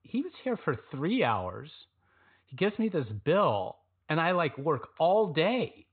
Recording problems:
high frequencies cut off; severe; nothing above 4 kHz

